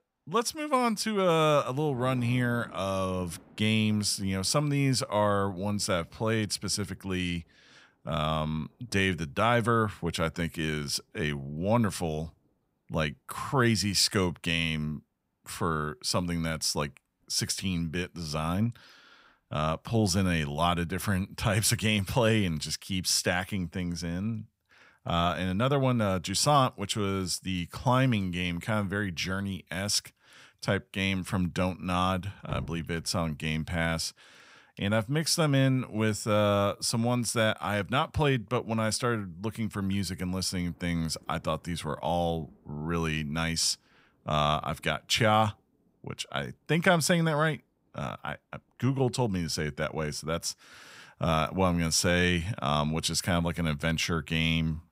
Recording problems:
rain or running water; faint; throughout; 25 dB below the speech

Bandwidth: 15.5 kHz